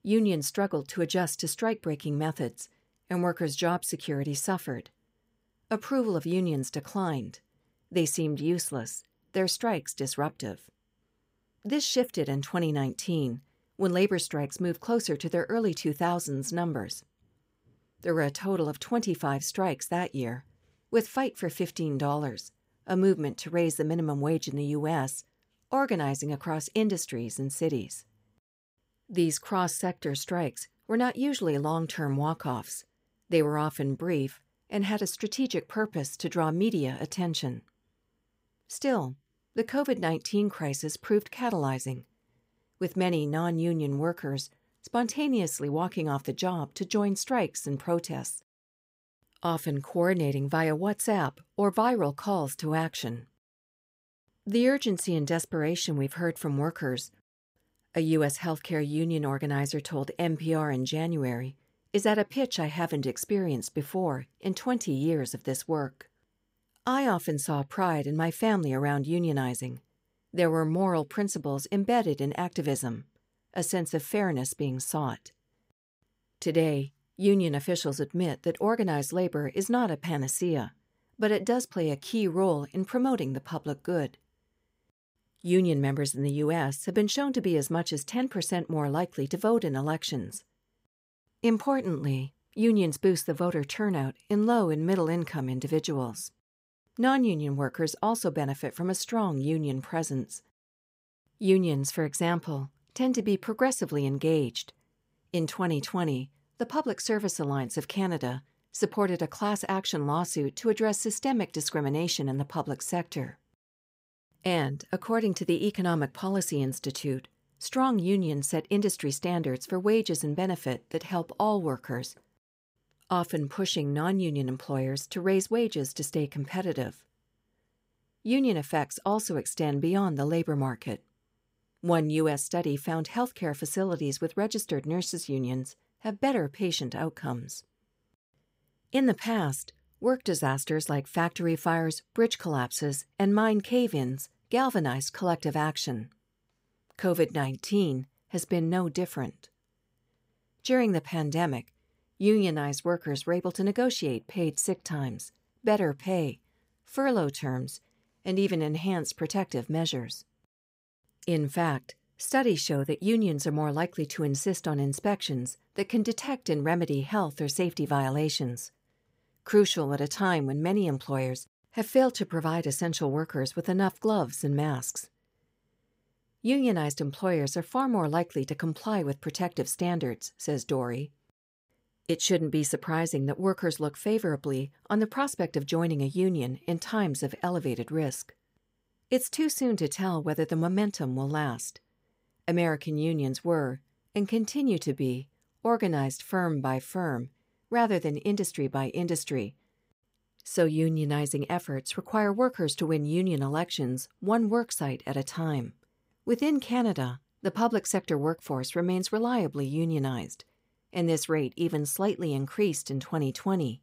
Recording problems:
none

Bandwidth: 15.5 kHz